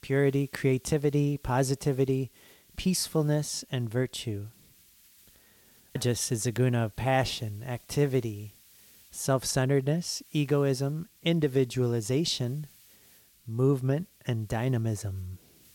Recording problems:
hiss; faint; throughout; 25 dB below the speech

